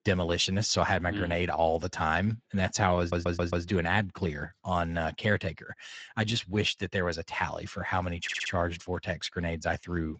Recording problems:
garbled, watery; slightly
audio stuttering; at 3 s and at 8 s

